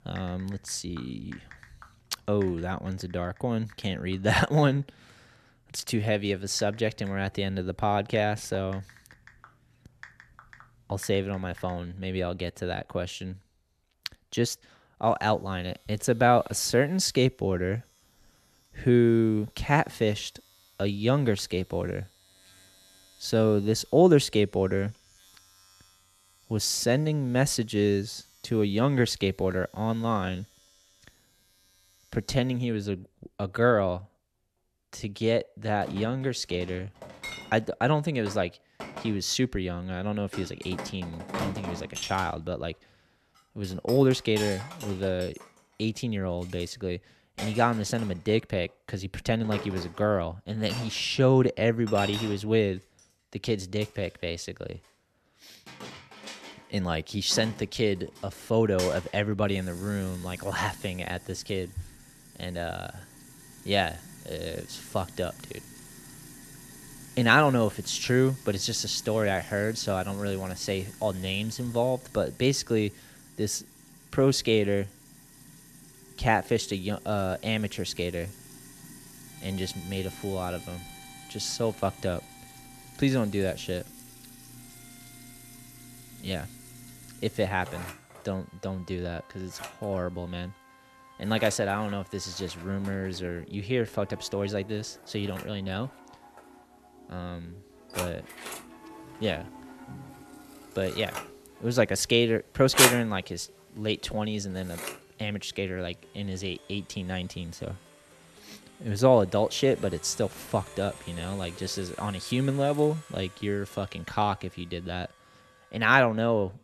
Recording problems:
household noises; noticeable; throughout; 10 dB below the speech
background music; faint; from 1:16 on; 25 dB below the speech

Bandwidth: 13.5 kHz